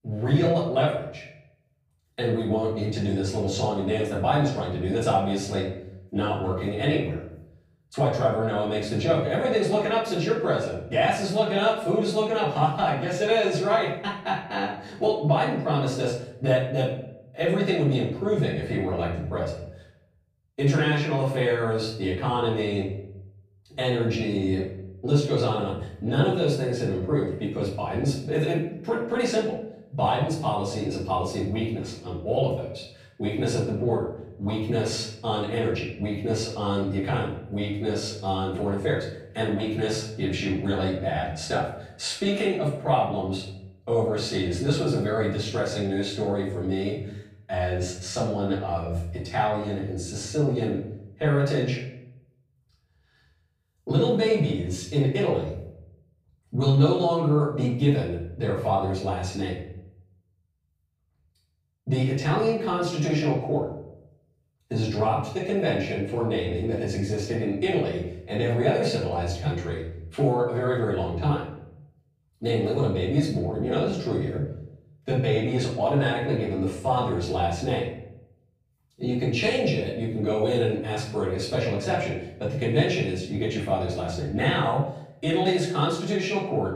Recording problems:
off-mic speech; far
room echo; noticeable; dies away in 0.6 s

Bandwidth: 15.5 kHz